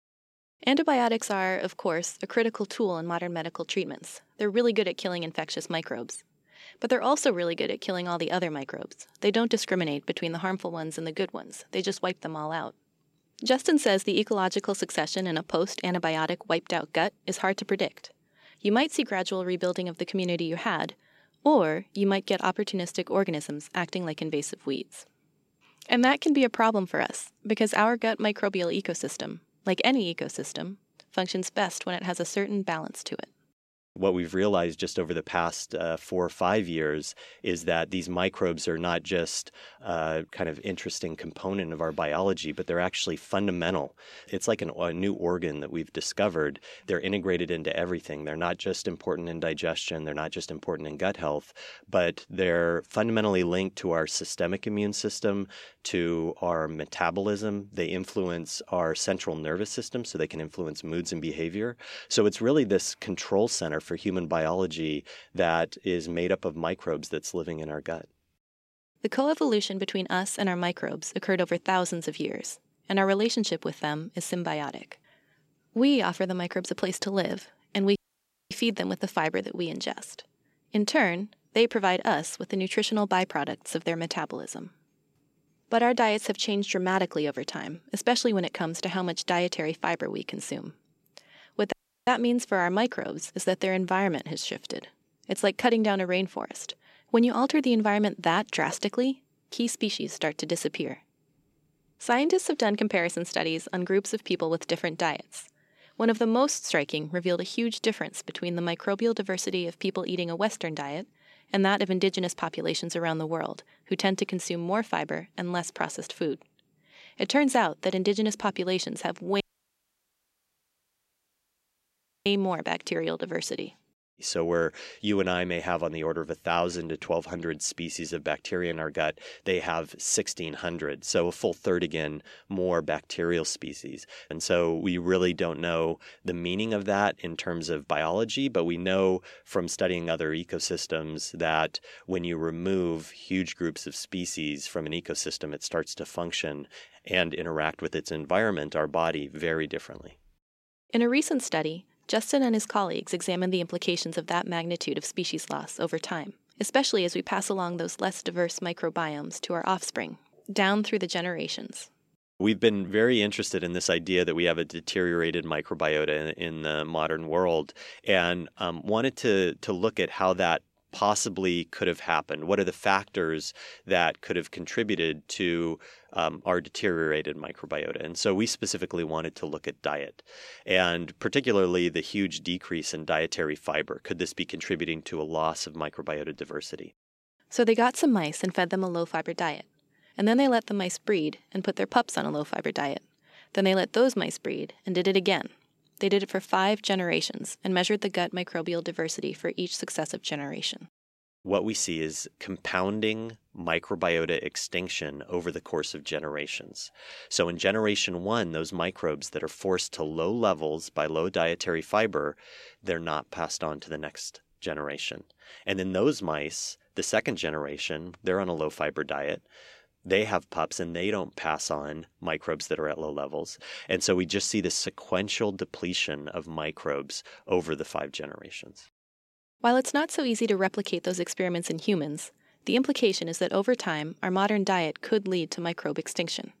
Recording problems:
audio cutting out; at 1:18 for 0.5 s, at 1:32 and at 1:59 for 3 s

